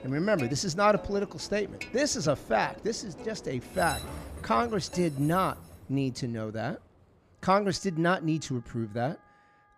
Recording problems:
background music; noticeable; throughout; 20 dB below the speech
train or aircraft noise; noticeable; throughout; 15 dB below the speech

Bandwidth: 15 kHz